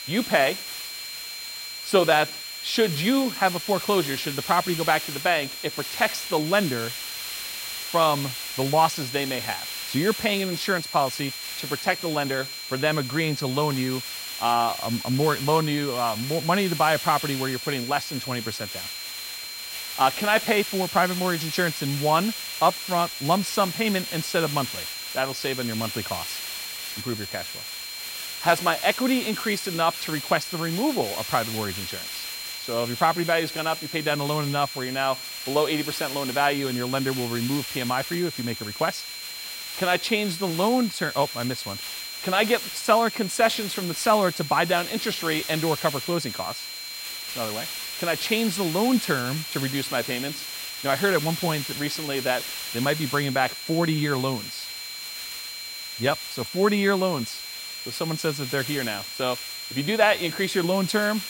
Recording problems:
high-pitched whine; loud; throughout; 4 kHz, 10 dB below the speech
hiss; loud; throughout; 9 dB below the speech

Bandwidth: 16 kHz